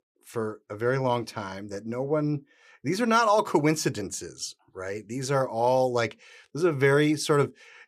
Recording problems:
none

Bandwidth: 15 kHz